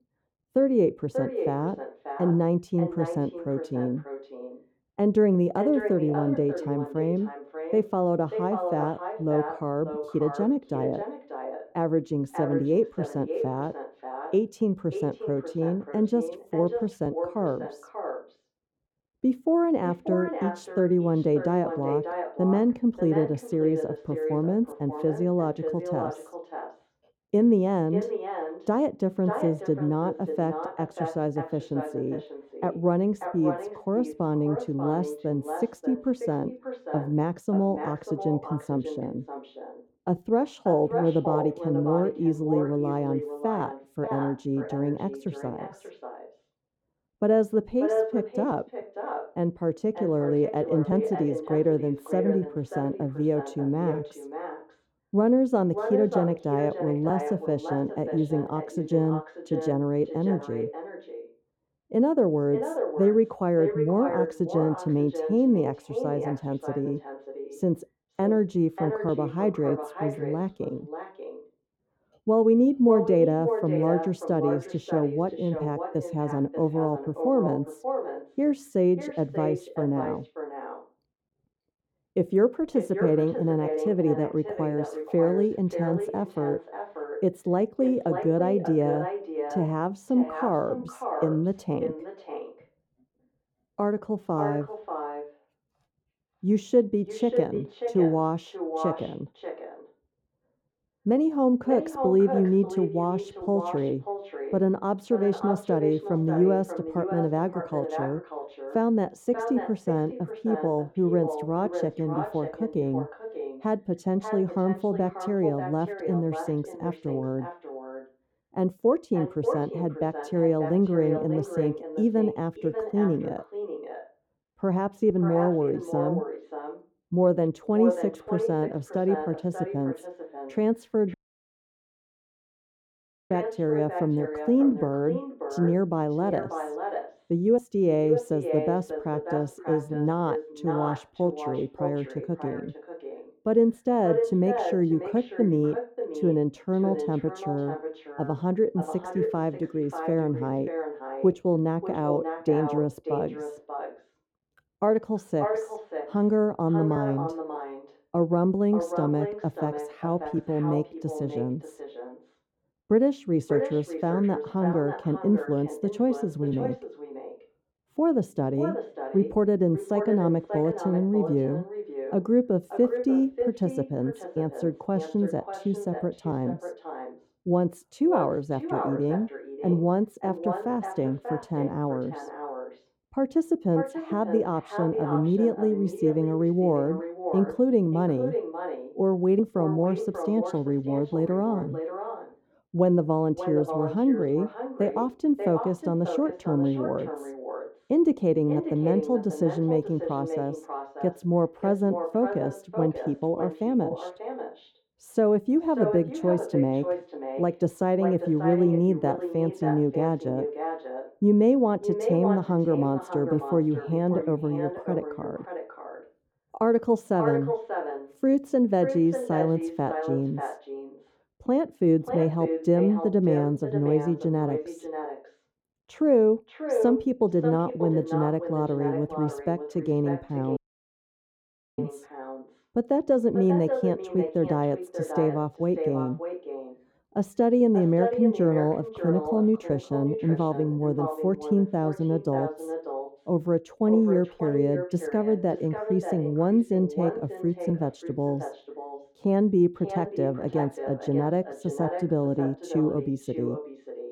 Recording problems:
echo of what is said; strong; throughout; 590 ms later, 8 dB below the speech
muffled; very; fading above 1 kHz
audio cutting out; at 2:11 for 2 s and at 3:51 for 1 s

